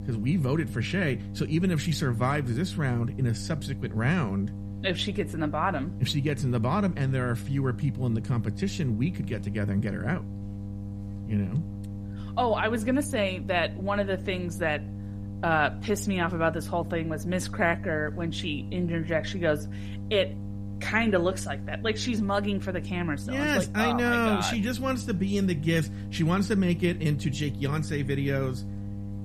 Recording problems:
electrical hum; noticeable; throughout; 50 Hz, 15 dB below the speech

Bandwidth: 14.5 kHz